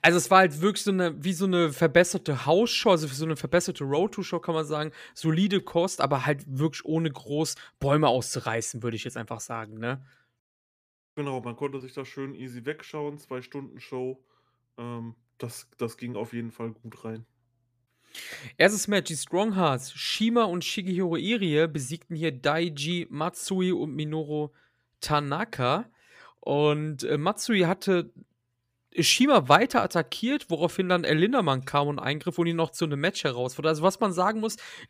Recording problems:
none

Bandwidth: 15 kHz